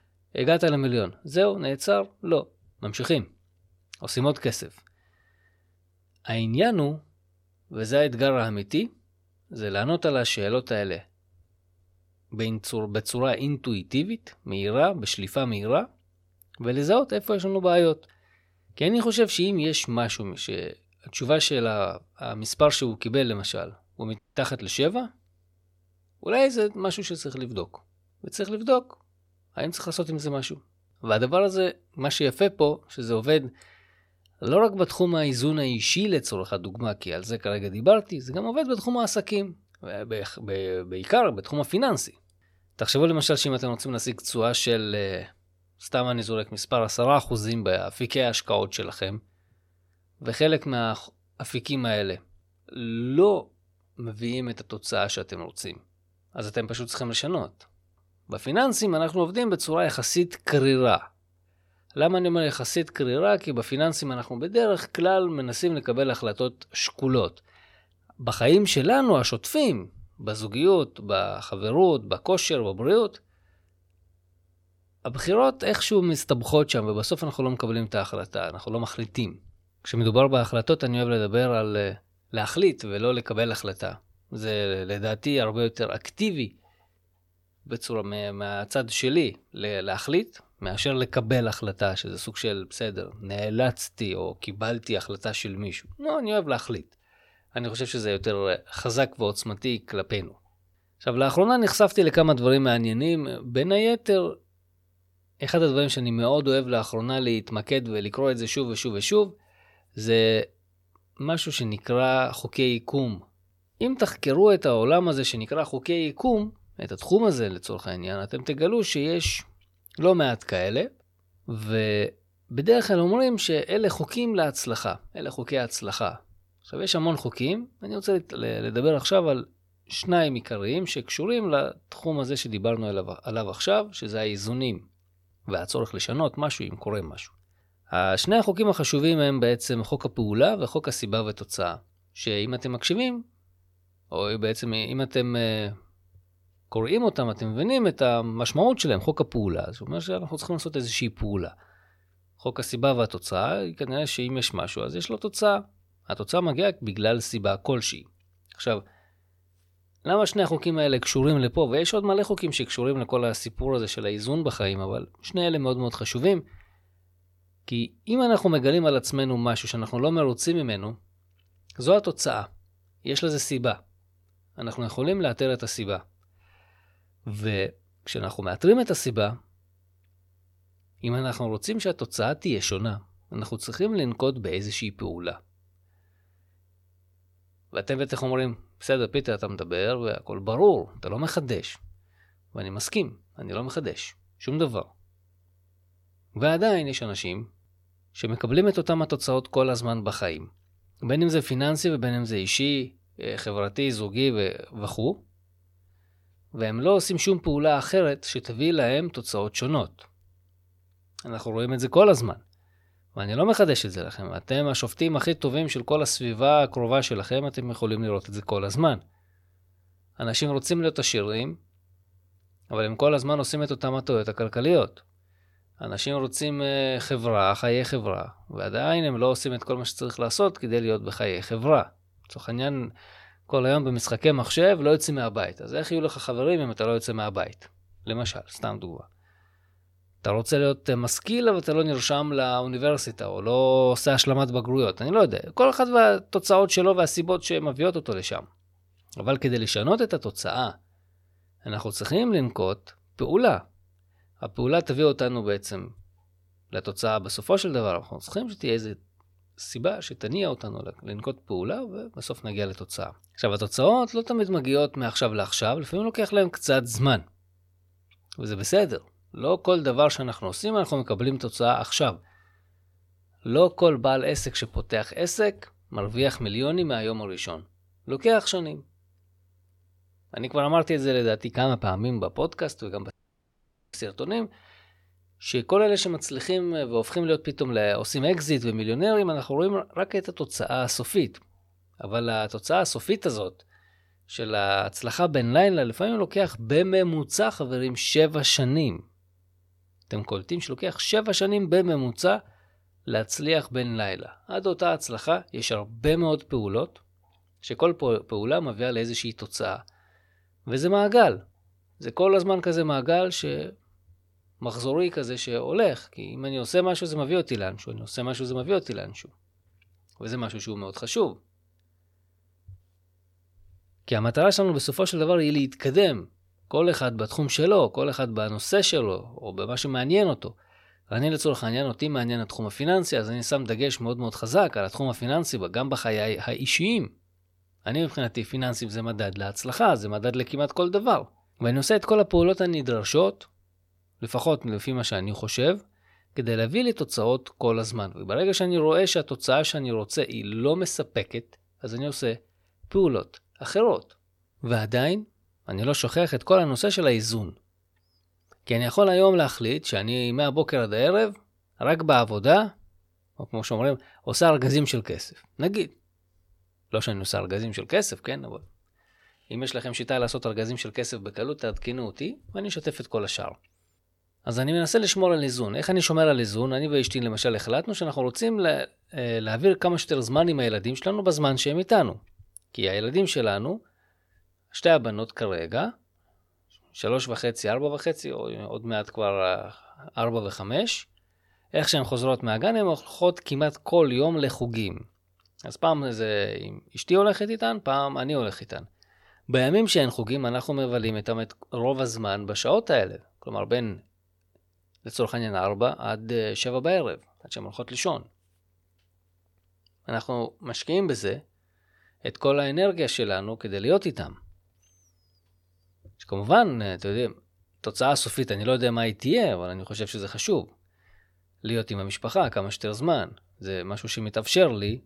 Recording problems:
audio cutting out; at 24 s and at 4:43 for 1 s

